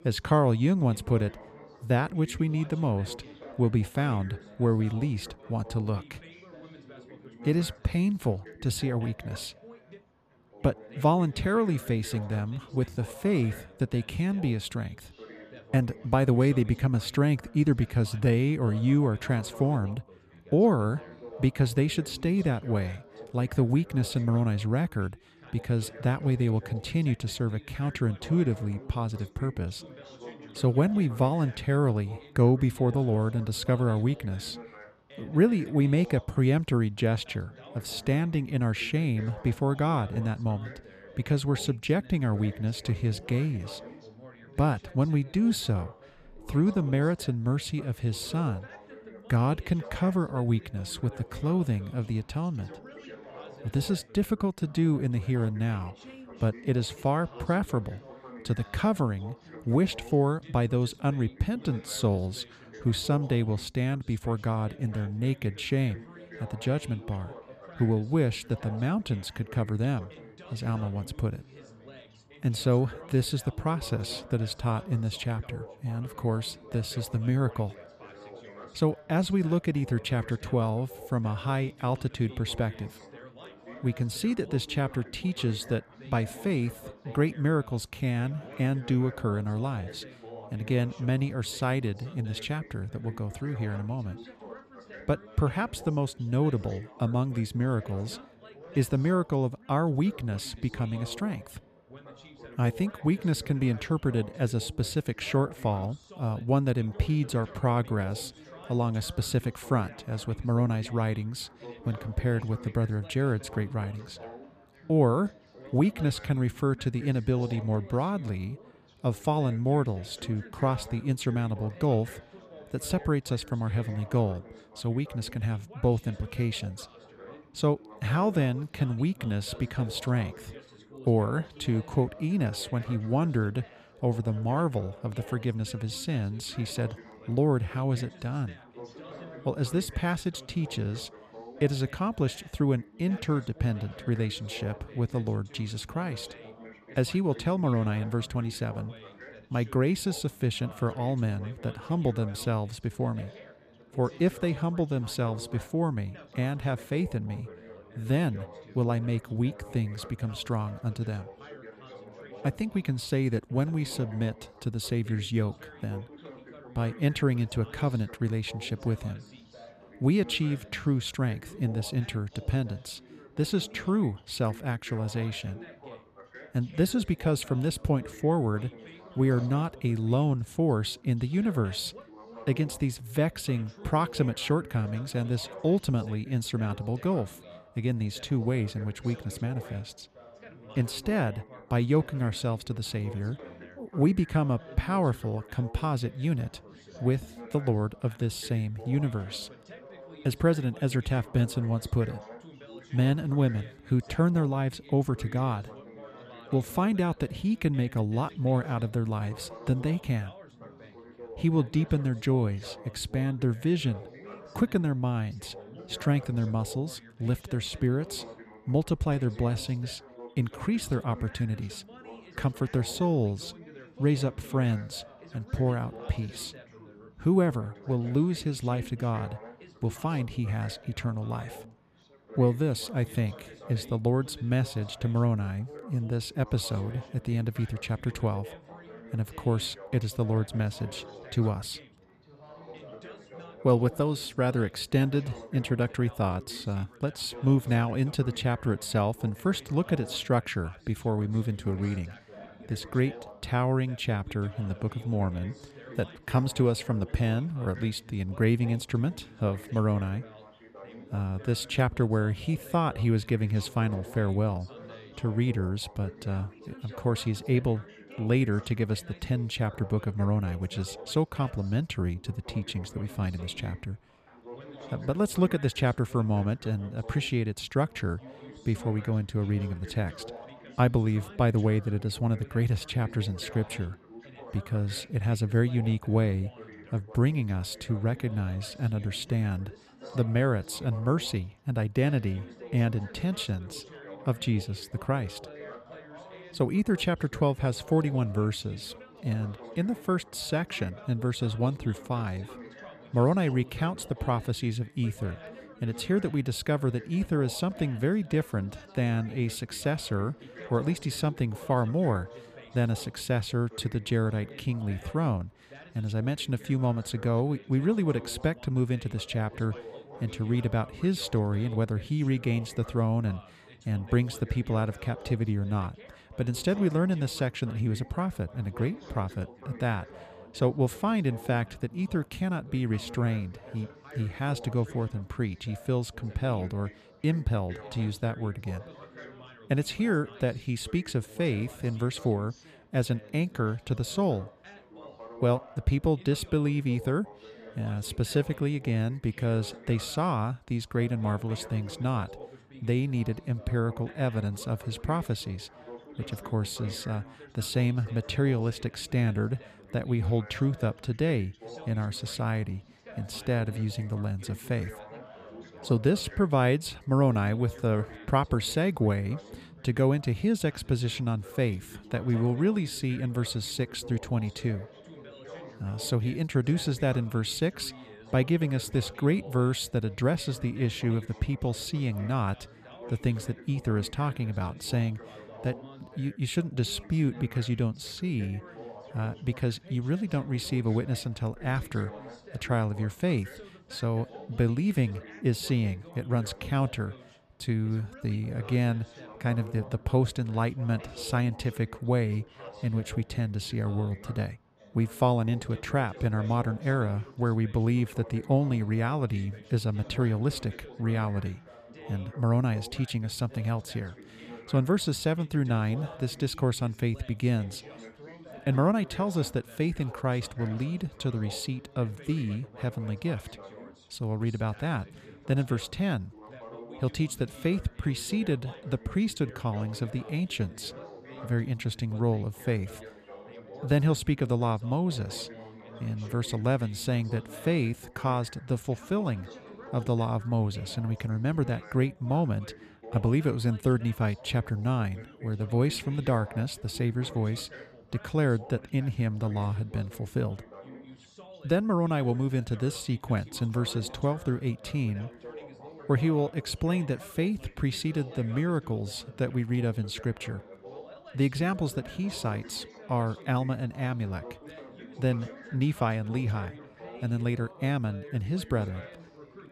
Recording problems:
background chatter; noticeable; throughout; 4 voices, 20 dB below the speech

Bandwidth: 14.5 kHz